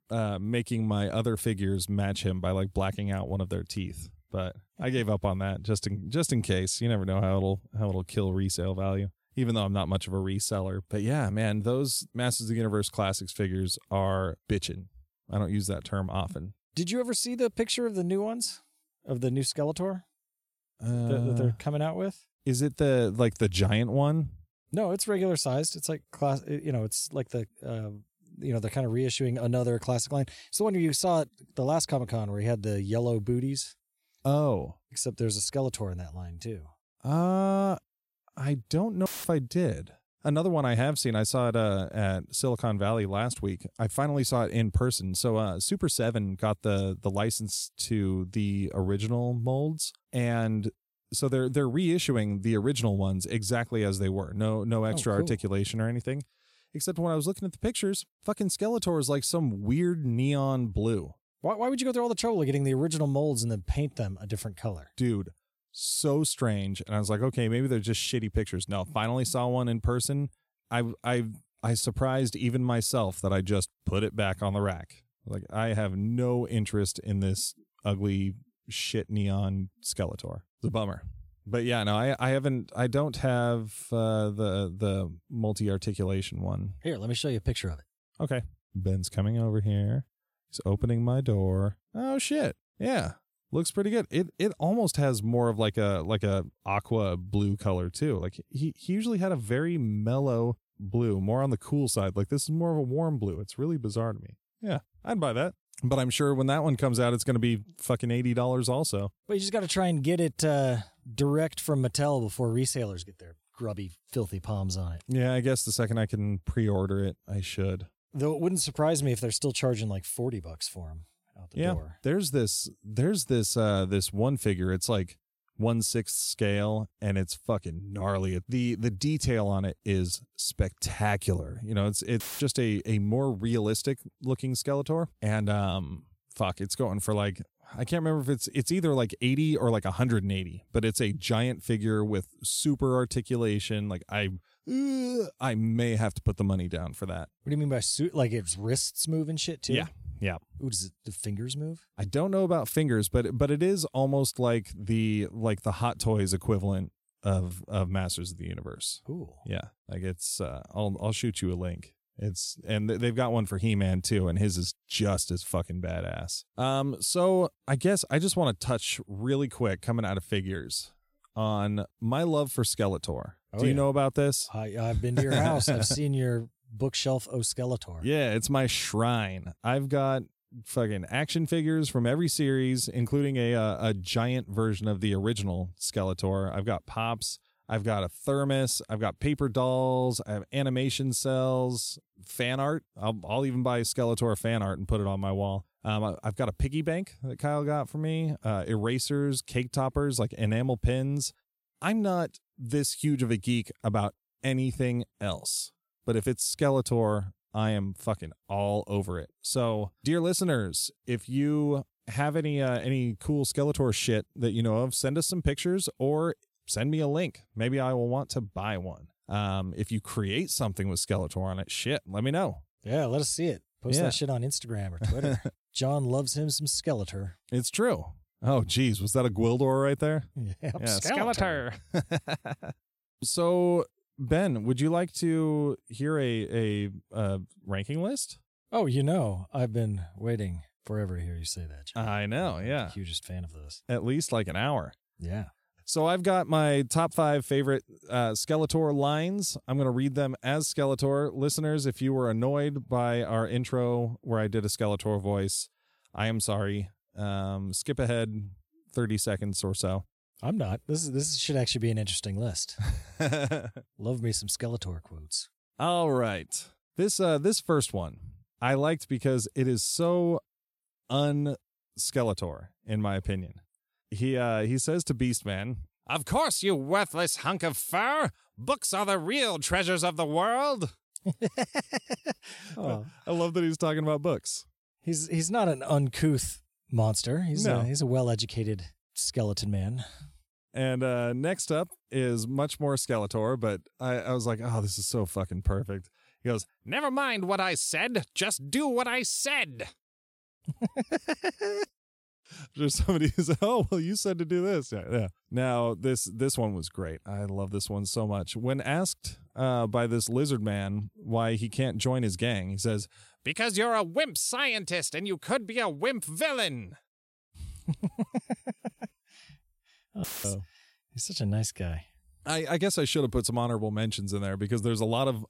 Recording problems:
audio cutting out; filled with static; at 39 s, at 2:12 and at 5:20

